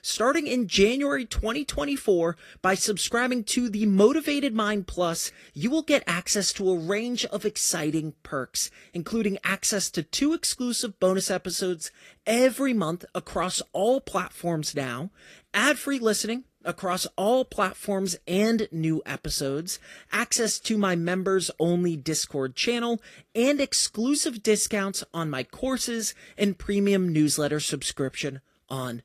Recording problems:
garbled, watery; slightly; nothing above 14.5 kHz

